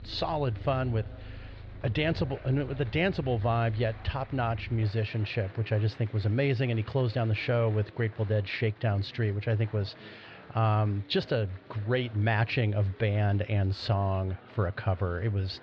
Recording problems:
muffled; very slightly; fading above 4 kHz
animal sounds; noticeable; until 5.5 s; 15 dB below the speech
murmuring crowd; faint; throughout; 20 dB below the speech

